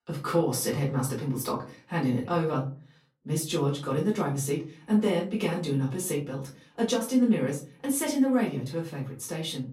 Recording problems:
off-mic speech; far
room echo; slight; dies away in 0.4 s

